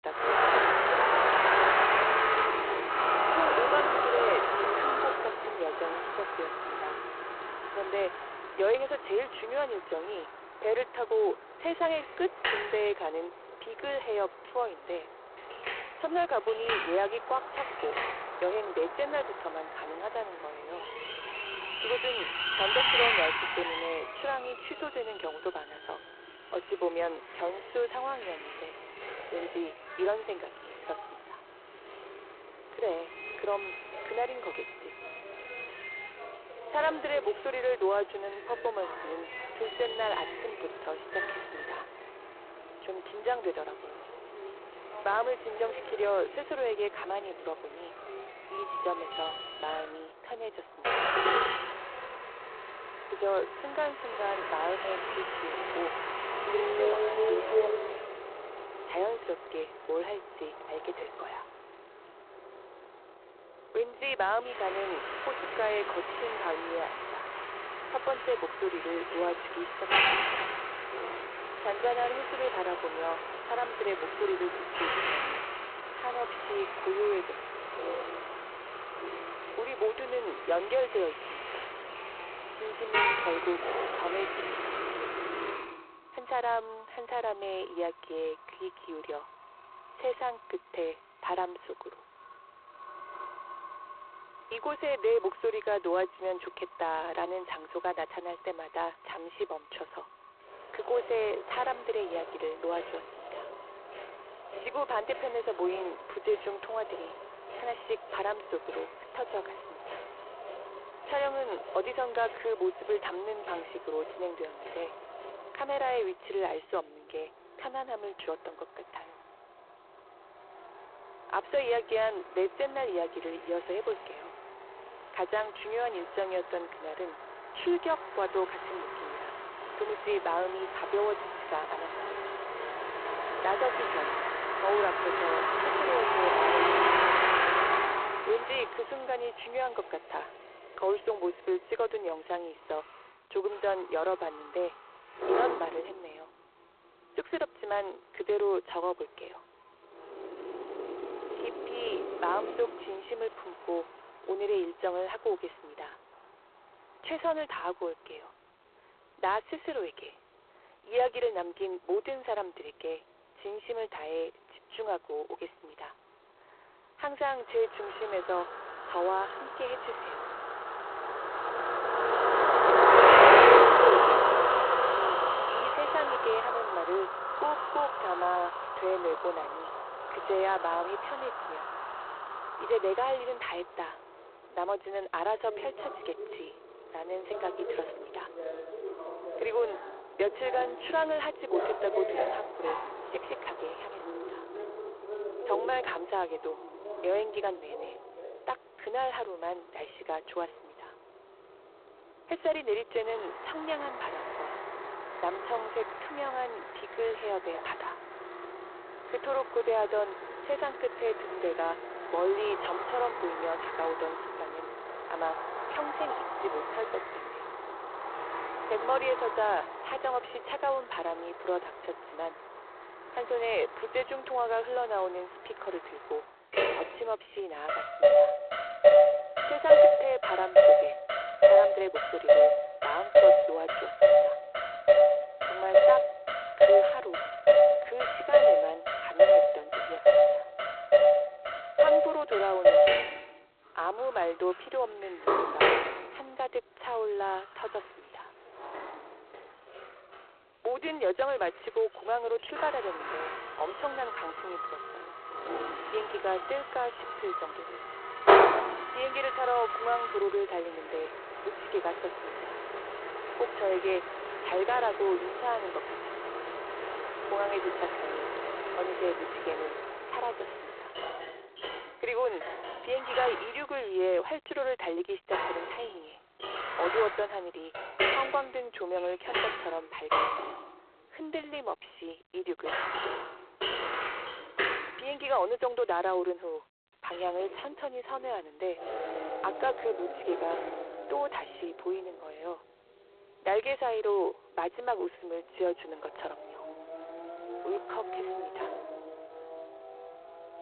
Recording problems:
phone-call audio; poor line
traffic noise; very loud; throughout; 6 dB above the speech

